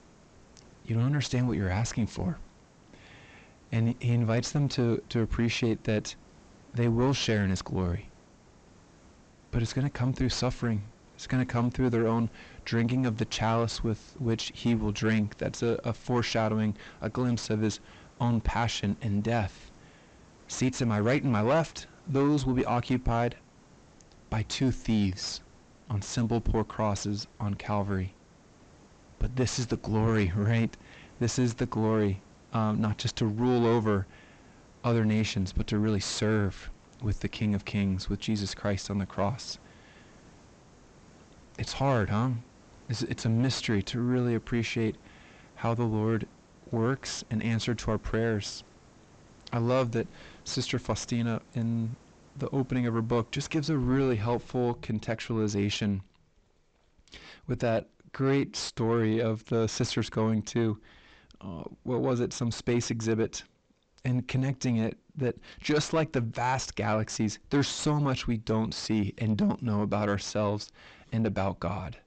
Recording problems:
high frequencies cut off; noticeable; nothing above 8 kHz
distortion; slight; 9 dB below the speech
hiss; faint; until 55 s; 25 dB below the speech

